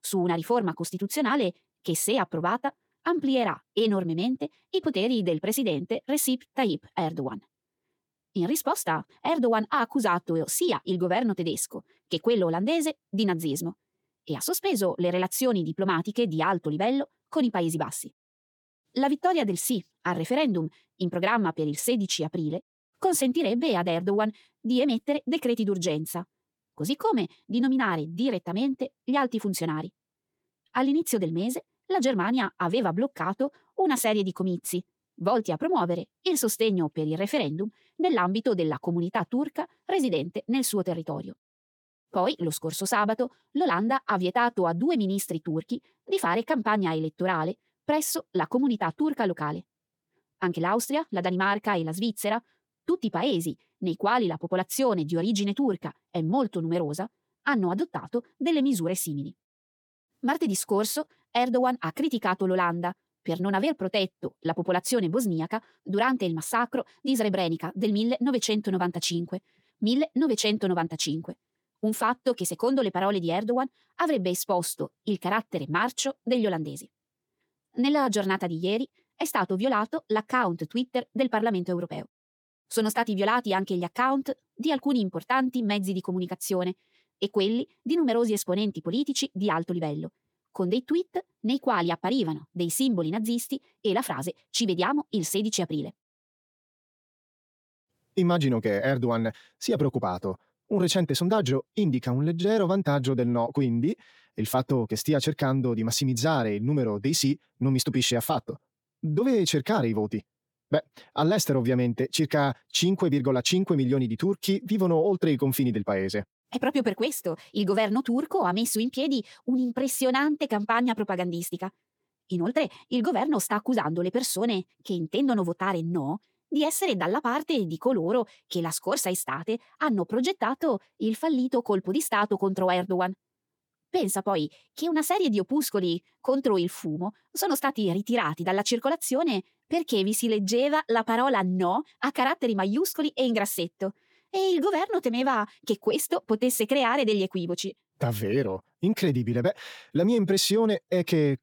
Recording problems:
wrong speed, natural pitch; too fast; 1.5 times normal speed

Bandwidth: 18.5 kHz